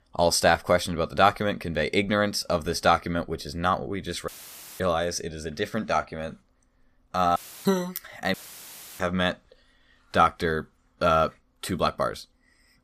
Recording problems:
audio cutting out; filled with static; at 4.5 s for 0.5 s, at 7.5 s and at 8.5 s for 0.5 s

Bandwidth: 14.5 kHz